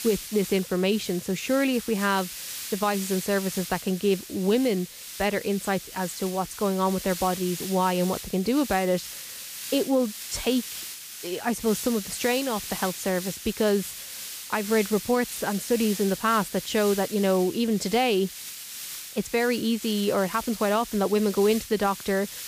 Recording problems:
hiss; loud; throughout; 9 dB below the speech

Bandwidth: 15 kHz